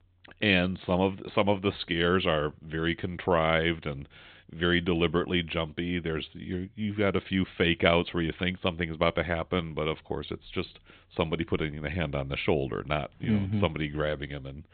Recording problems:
high frequencies cut off; severe; nothing above 4 kHz

